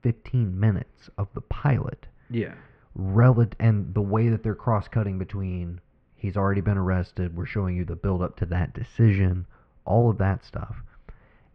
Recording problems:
muffled; very; fading above 2.5 kHz

